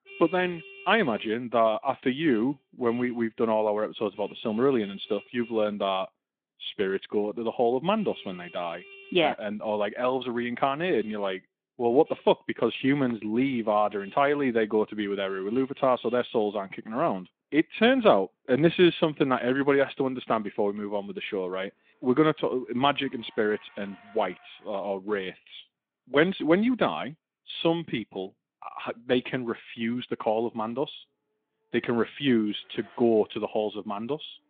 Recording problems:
phone-call audio; nothing above 3.5 kHz
traffic noise; faint; throughout; 25 dB below the speech

